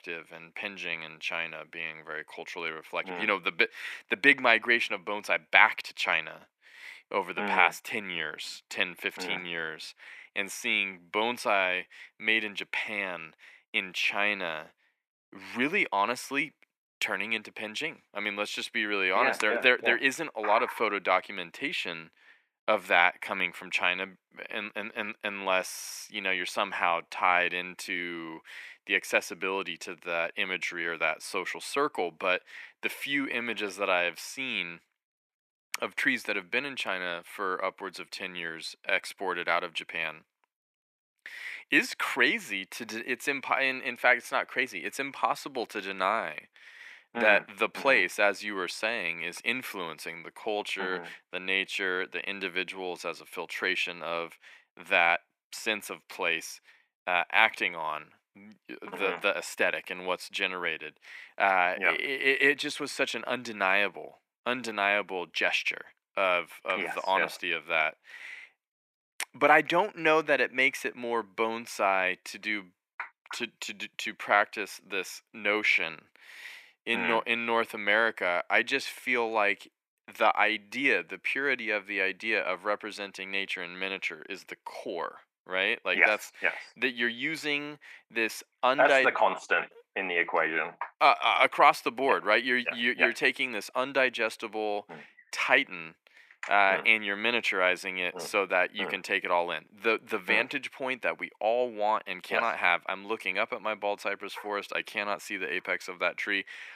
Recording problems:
thin; somewhat; fading below 300 Hz

